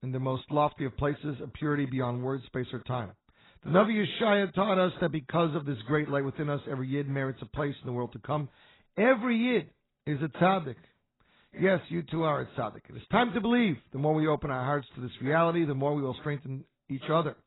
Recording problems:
garbled, watery; badly; nothing above 4 kHz

